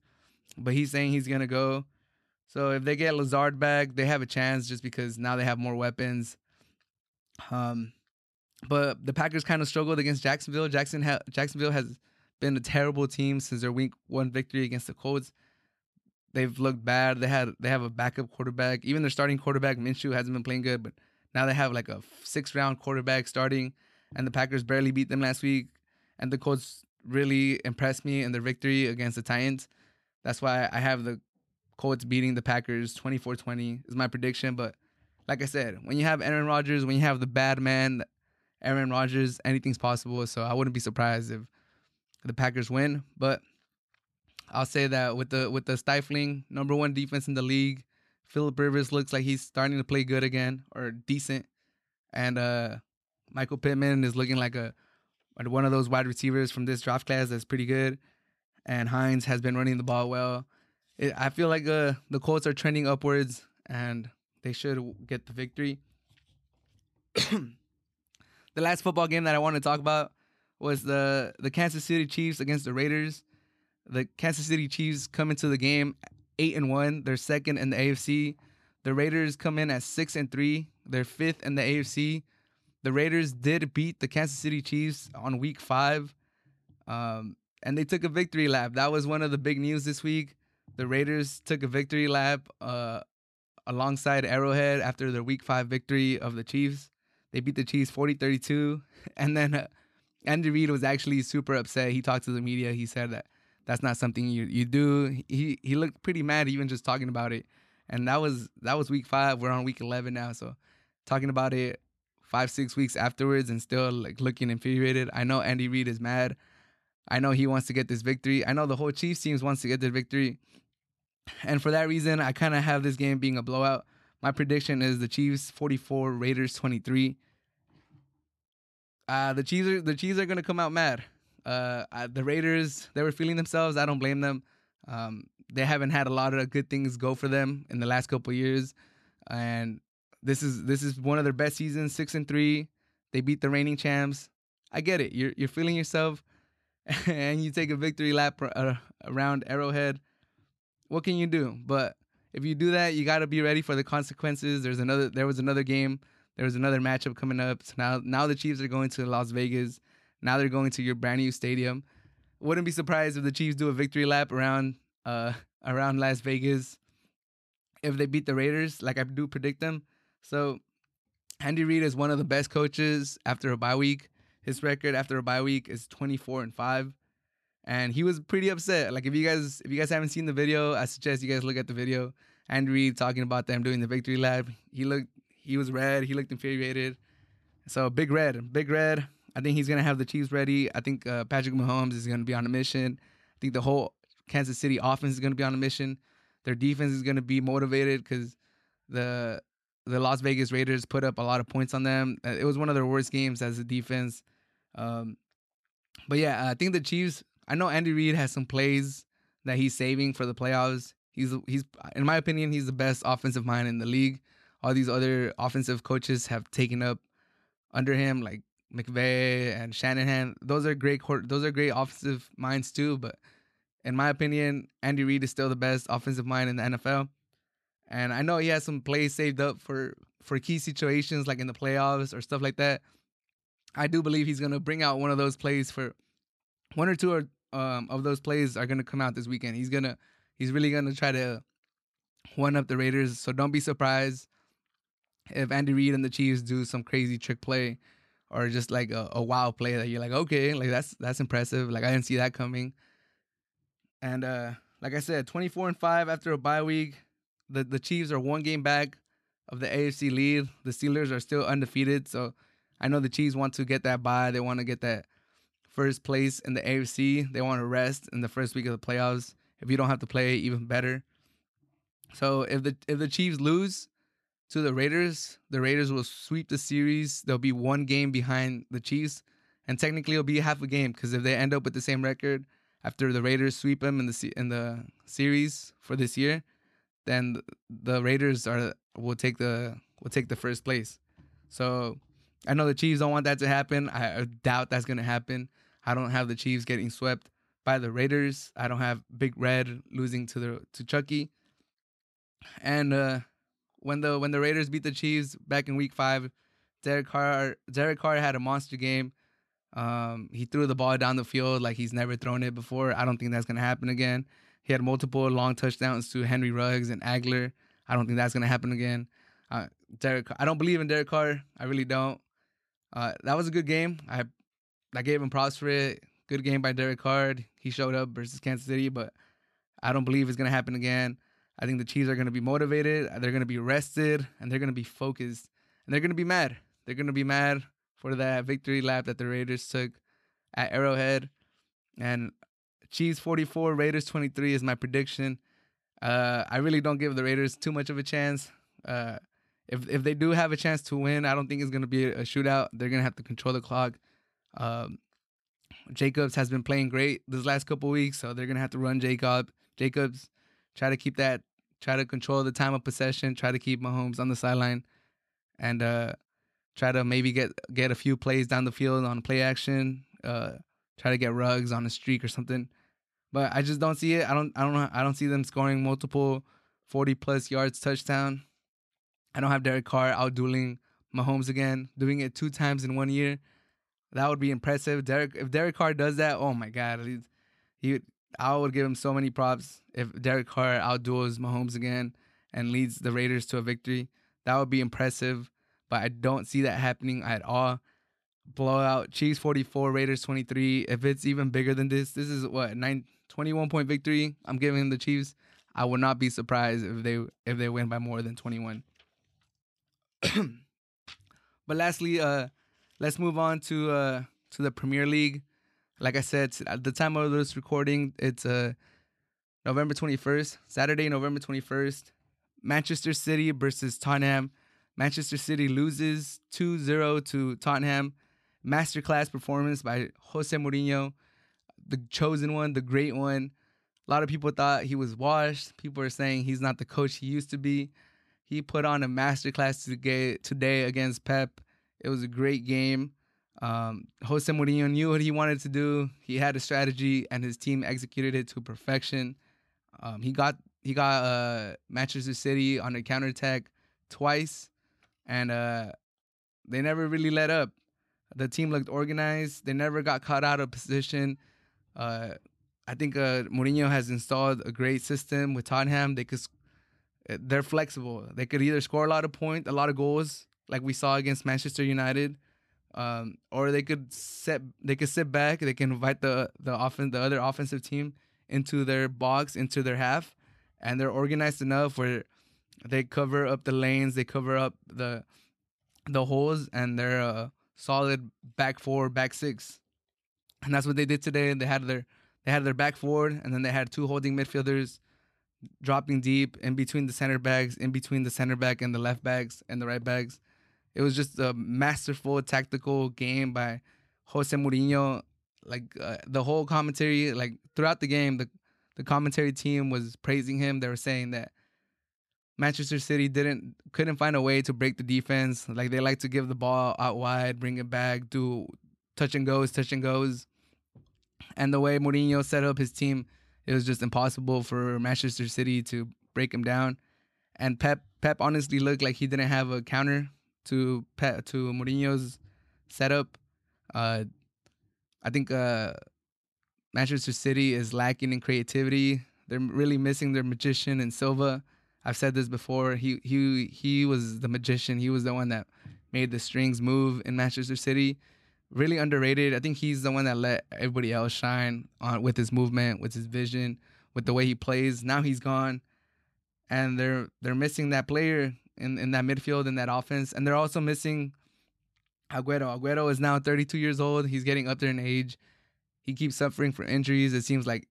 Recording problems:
none

